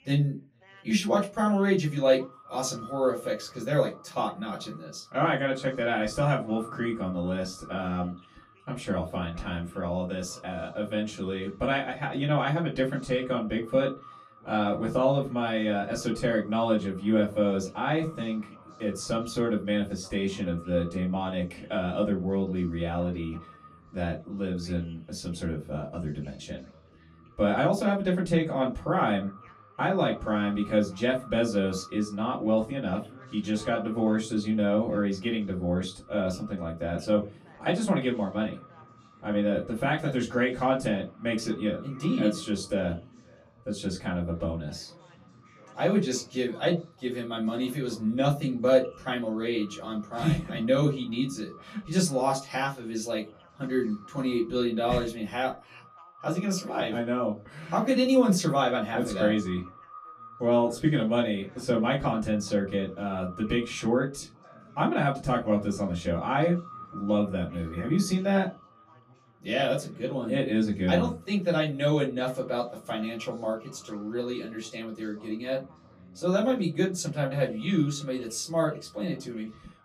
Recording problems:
off-mic speech; far
echo of what is said; faint; throughout; 440 ms later, 25 dB below the speech
room echo; very slight; dies away in 0.2 s
background chatter; faint; throughout; 3 voices, 25 dB below the speech

